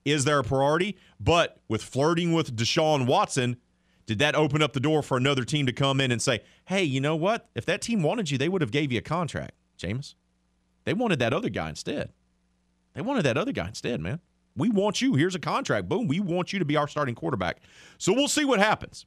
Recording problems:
none

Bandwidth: 14.5 kHz